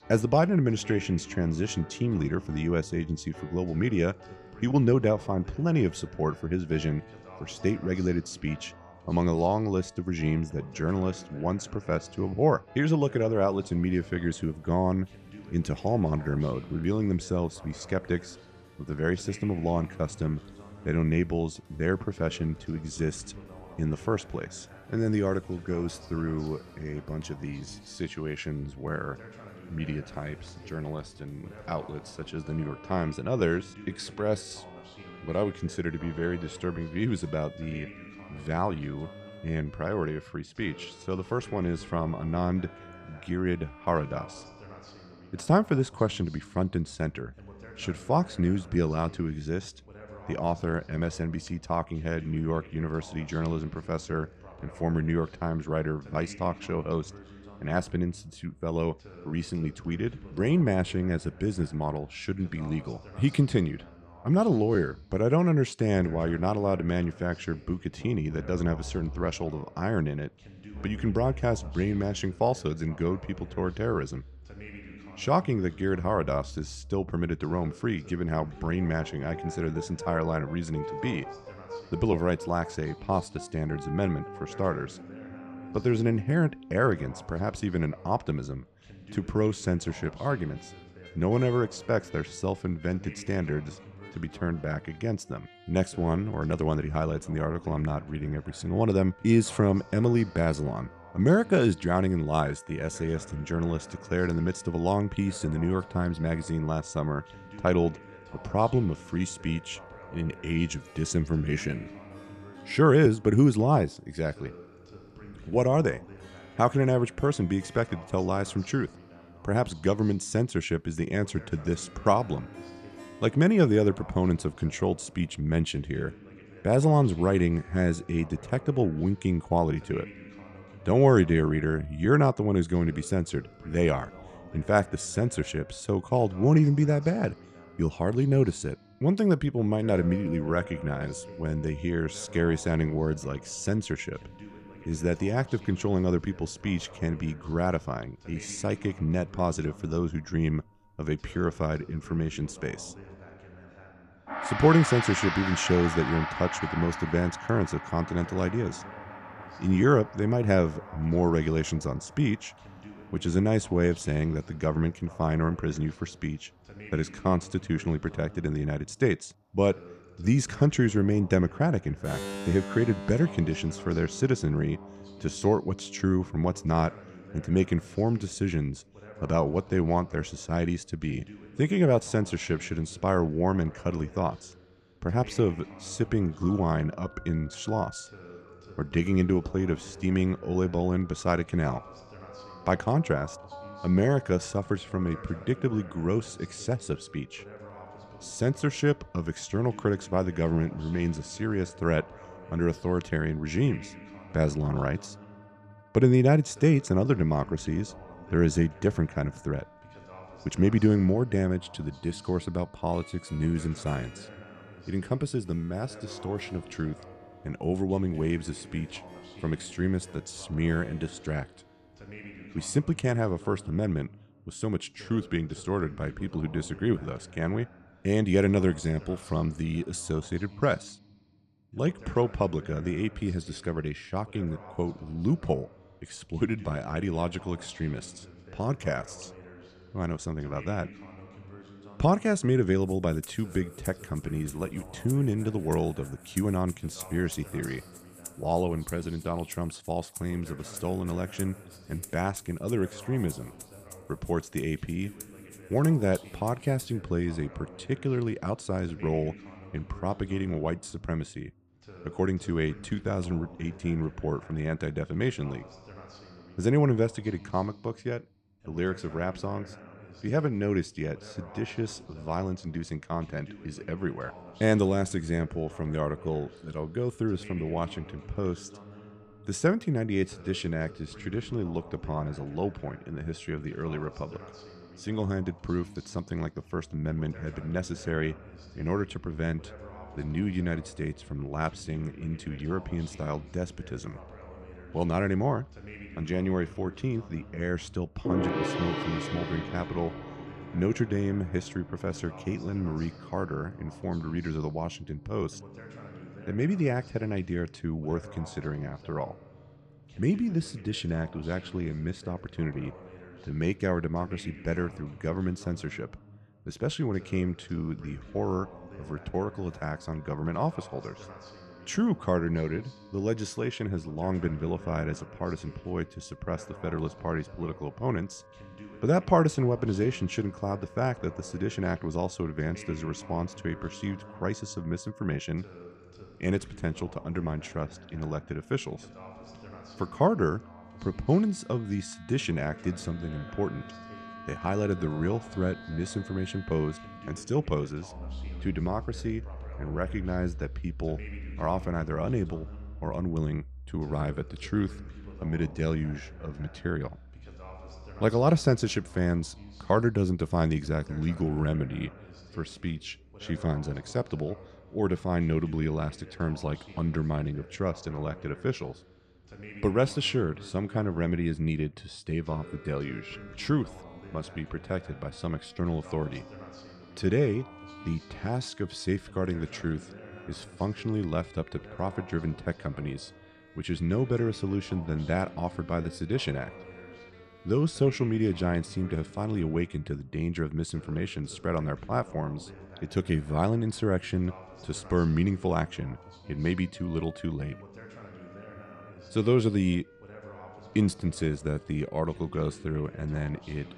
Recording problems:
background music; noticeable; throughout; 15 dB below the speech
voice in the background; faint; throughout; 20 dB below the speech

